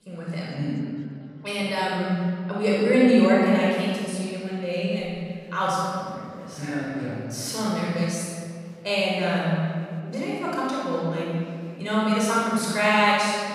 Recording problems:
room echo; strong; dies away in 1.9 s
off-mic speech; far
chatter from many people; faint; throughout; 30 dB below the speech

